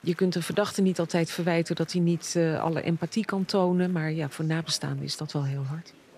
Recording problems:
murmuring crowd; faint; throughout; 25 dB below the speech

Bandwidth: 14.5 kHz